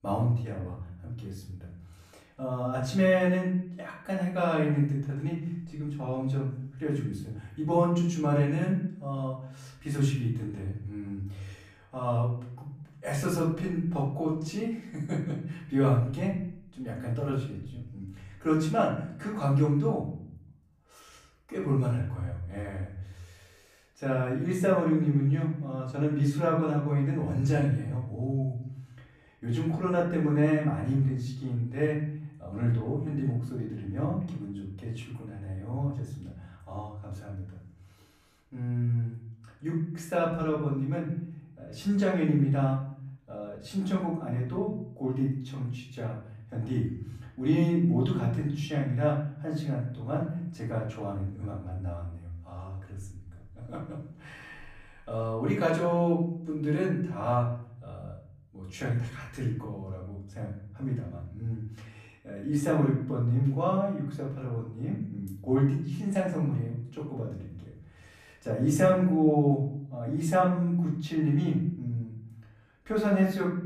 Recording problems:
off-mic speech; far
room echo; noticeable; dies away in 0.7 s

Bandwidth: 14.5 kHz